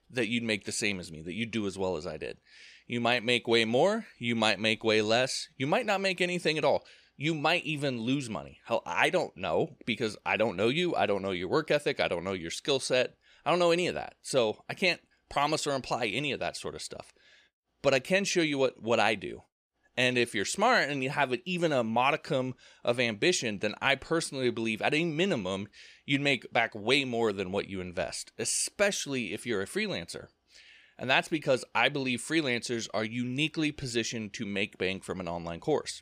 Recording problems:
none

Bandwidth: 15 kHz